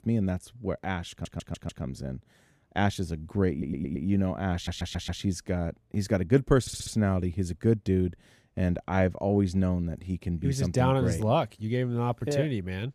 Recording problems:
audio stuttering; 4 times, first at 1 s

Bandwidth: 14.5 kHz